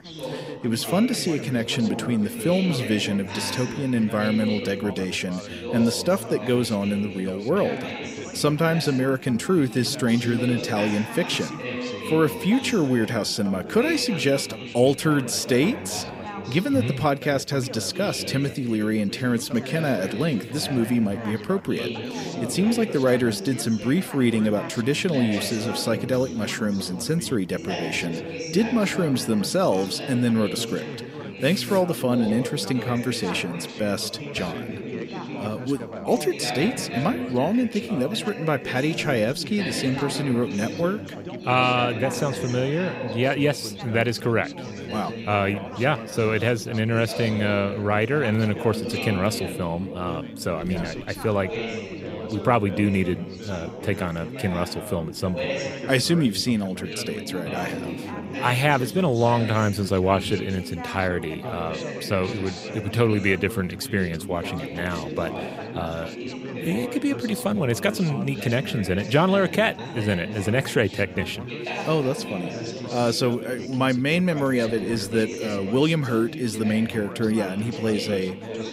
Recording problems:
background chatter; loud; throughout; 4 voices, 8 dB below the speech

